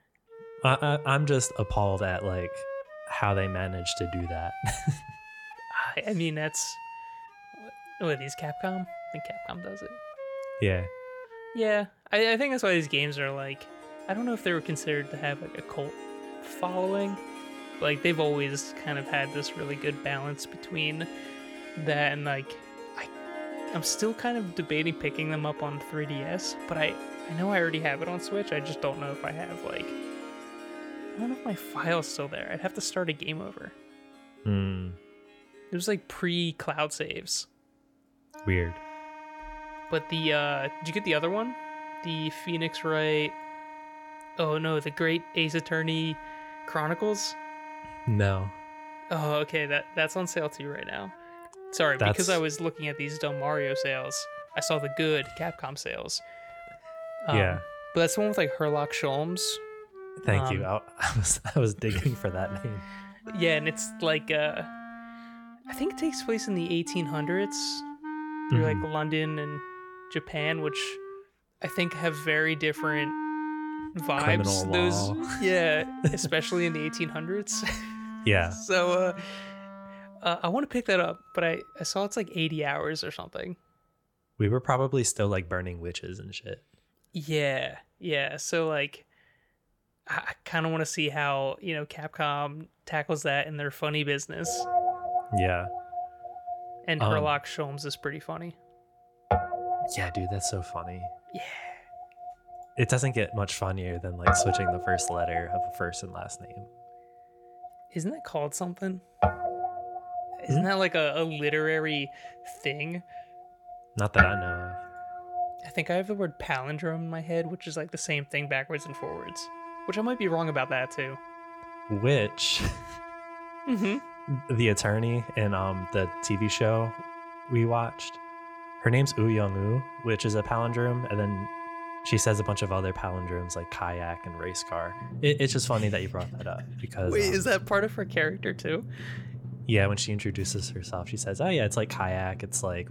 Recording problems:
background music; loud; throughout; 9 dB below the speech

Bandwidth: 17.5 kHz